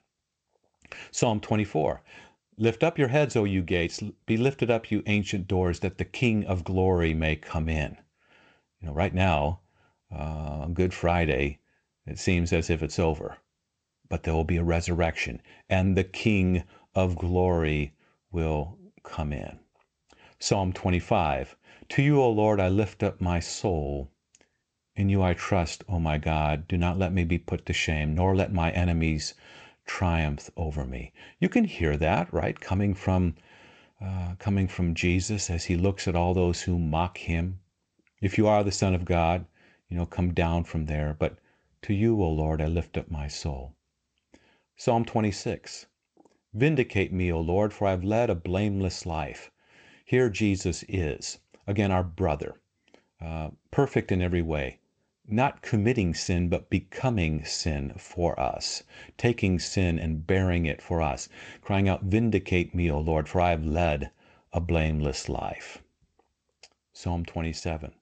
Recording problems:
garbled, watery; slightly; nothing above 7.5 kHz

